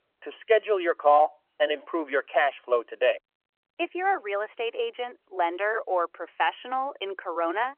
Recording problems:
phone-call audio; nothing above 3 kHz

